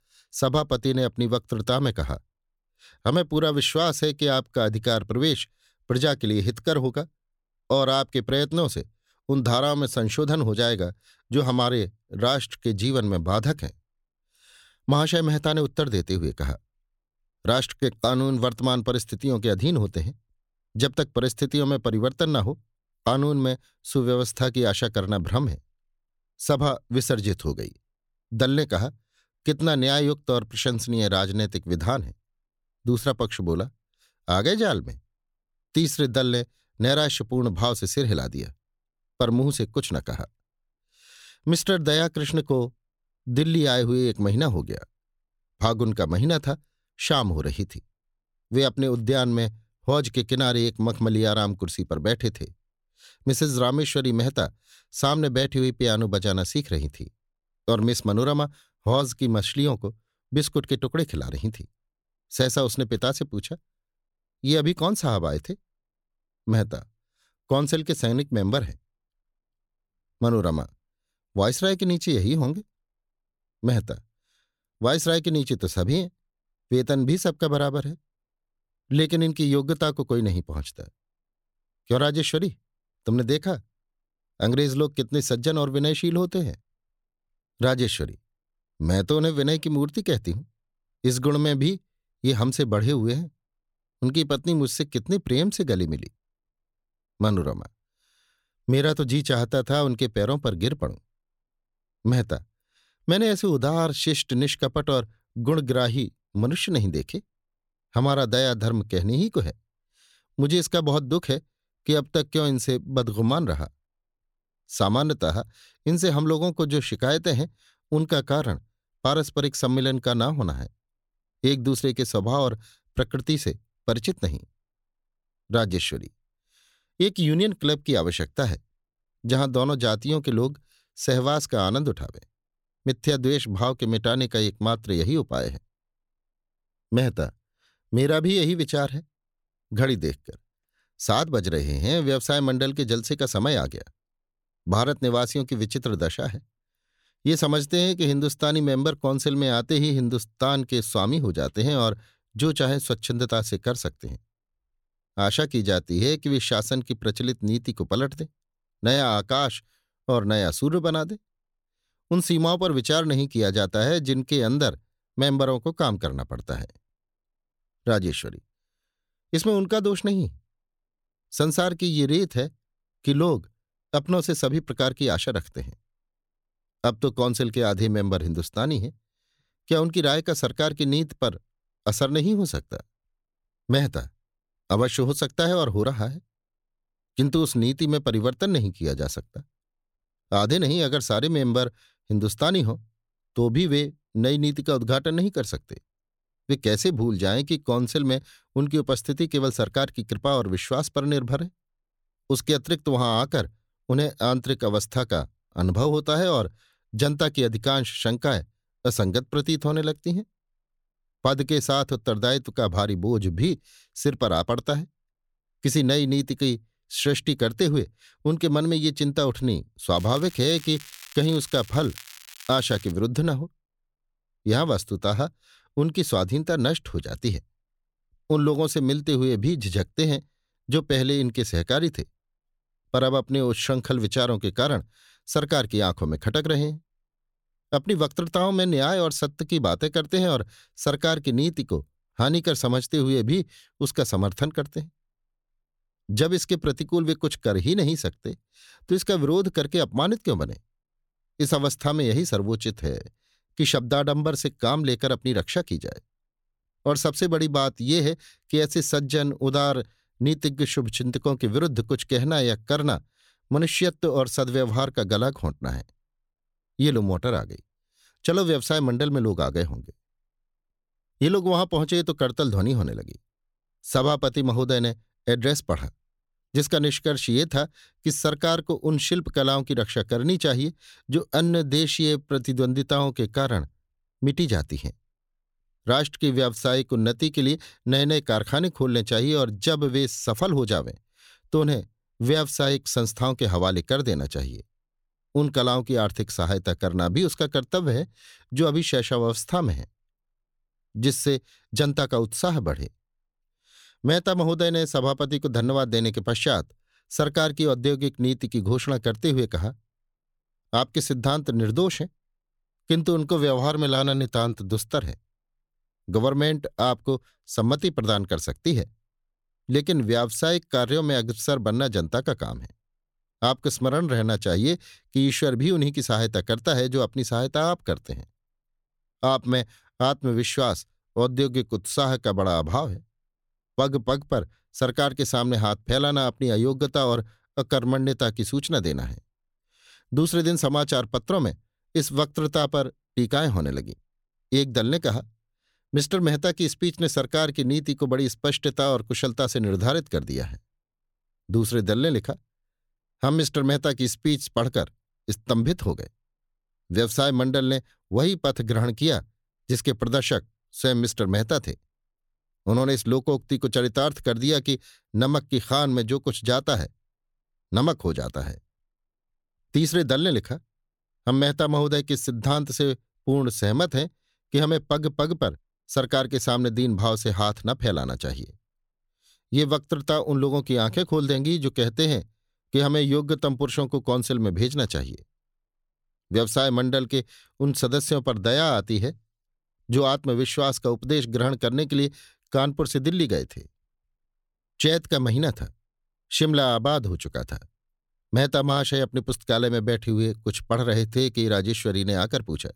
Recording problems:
crackling; noticeable; from 3:40 to 3:43; 20 dB below the speech

